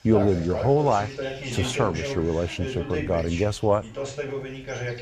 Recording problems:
voice in the background; loud; throughout; 7 dB below the speech

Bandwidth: 14.5 kHz